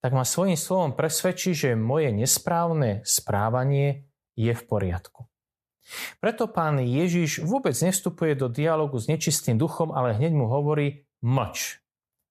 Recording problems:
none

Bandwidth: 14.5 kHz